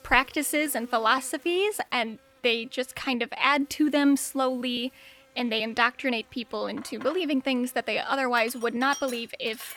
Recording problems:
household noises; noticeable; throughout; 20 dB below the speech
electrical hum; faint; throughout; 50 Hz, 30 dB below the speech

